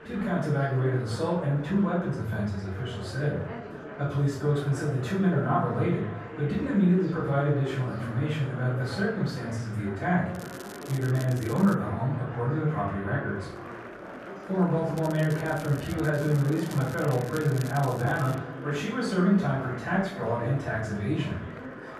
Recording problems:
off-mic speech; far
room echo; noticeable; dies away in 0.5 s
muffled; slightly; fading above 2.5 kHz
echo of what is said; faint; from 5 s on; 260 ms later, 20 dB below the speech
murmuring crowd; noticeable; throughout; 15 dB below the speech
crackling; noticeable; from 10 to 12 s and from 15 to 18 s; 20 dB below the speech

